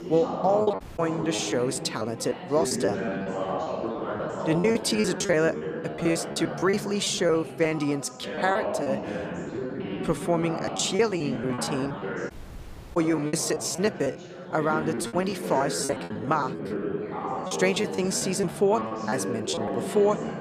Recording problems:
background chatter; loud; throughout; 3 voices, 6 dB below the speech
choppy; very; 15% of the speech affected
audio cutting out; at 1 s and at 12 s for 0.5 s

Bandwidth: 15 kHz